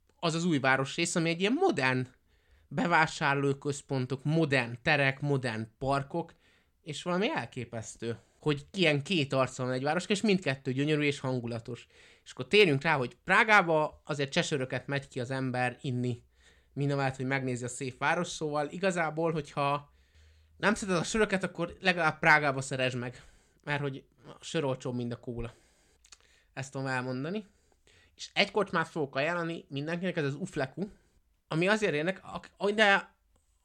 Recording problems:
none

